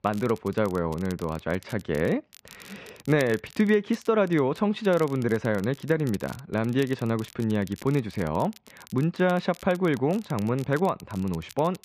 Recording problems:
muffled; slightly; fading above 2.5 kHz
crackle, like an old record; faint; 25 dB below the speech

